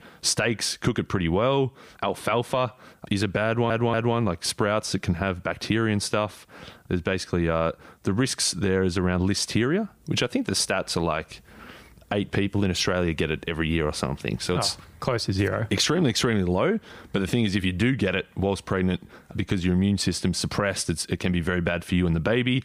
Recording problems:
squashed, flat; somewhat
audio stuttering; at 3.5 s

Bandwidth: 15 kHz